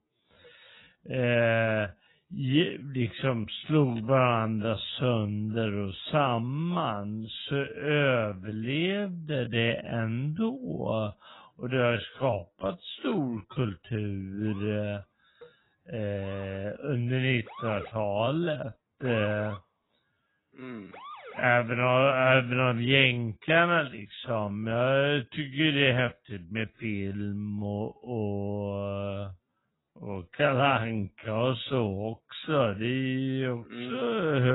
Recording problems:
garbled, watery; badly; nothing above 3.5 kHz
wrong speed, natural pitch; too slow; 0.5 times normal speed
siren; faint; from 14 to 21 s; peak 10 dB below the speech
abrupt cut into speech; at the end

